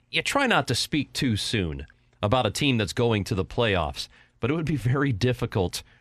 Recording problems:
none

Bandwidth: 14 kHz